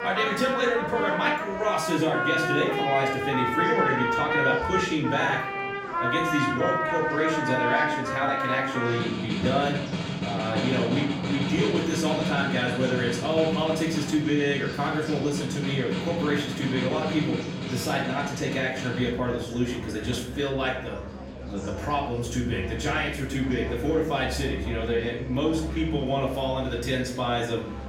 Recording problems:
off-mic speech; far
room echo; noticeable; dies away in 0.6 s
background music; loud; throughout; 2 dB below the speech
murmuring crowd; noticeable; throughout; 15 dB below the speech

